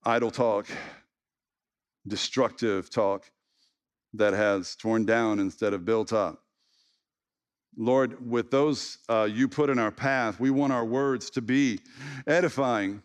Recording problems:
none

